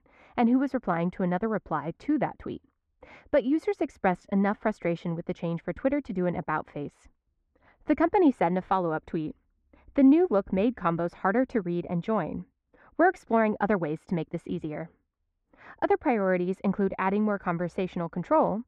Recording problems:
muffled; very; fading above 1.5 kHz

